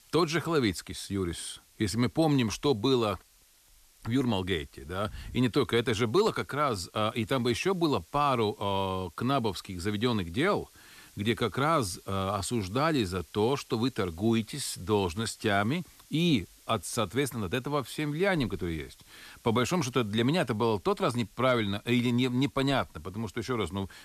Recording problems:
hiss; faint; throughout; 30 dB below the speech

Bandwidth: 14 kHz